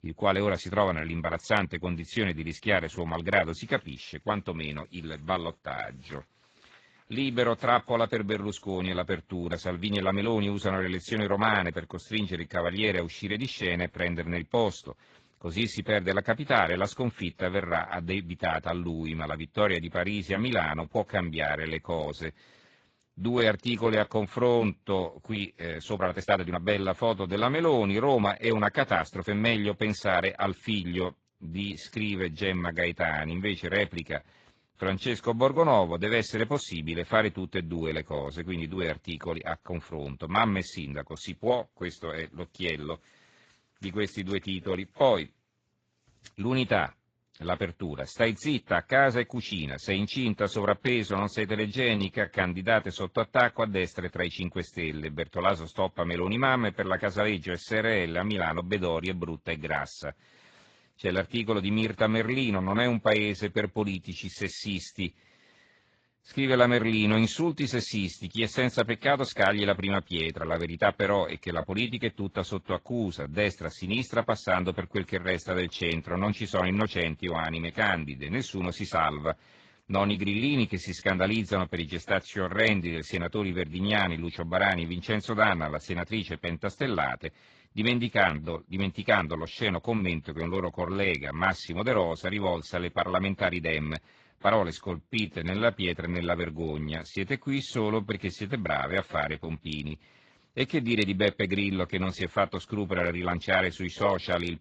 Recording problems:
garbled, watery; slightly
uneven, jittery; strongly; from 5.5 s to 1:38

